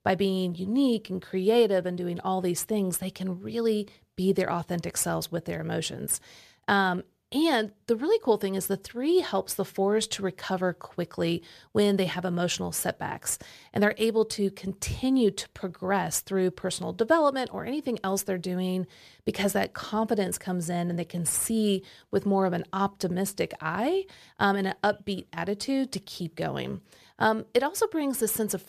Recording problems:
none

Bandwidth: 14.5 kHz